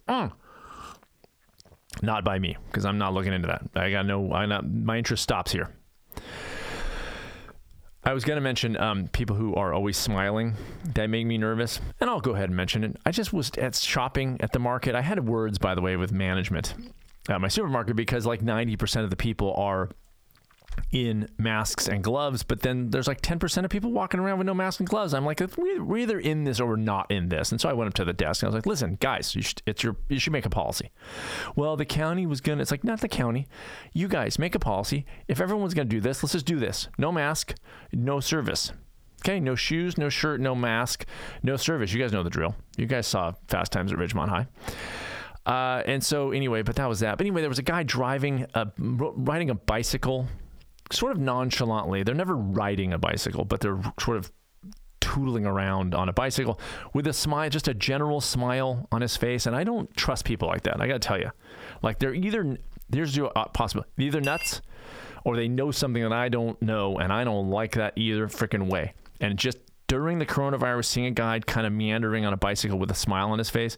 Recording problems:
squashed, flat; heavily
clattering dishes; noticeable; at 1:04; peak 4 dB below the speech

